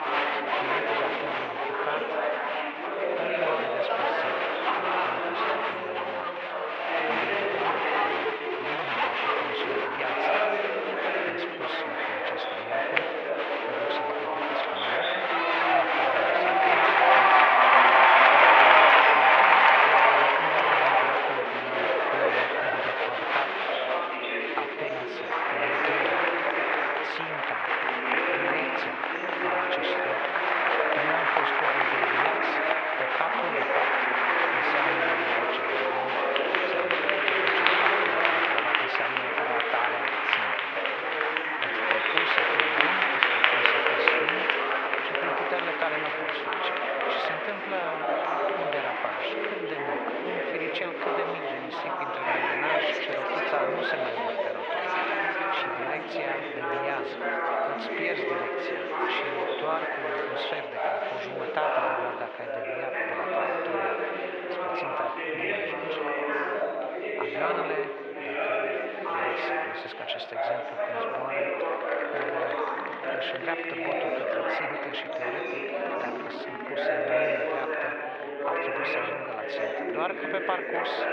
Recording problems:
muffled; very; fading above 2.5 kHz
thin; very; fading below 750 Hz
echo of what is said; faint; from 48 s on; 80 ms later, 20 dB below the speech
chatter from many people; very loud; throughout; 10 dB above the speech
uneven, jittery; strongly; from 8 s to 1:17

